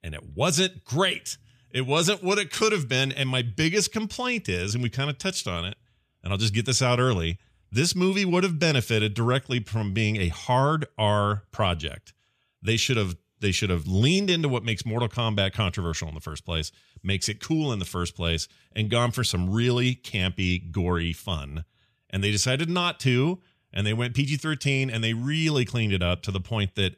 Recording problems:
none

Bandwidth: 14.5 kHz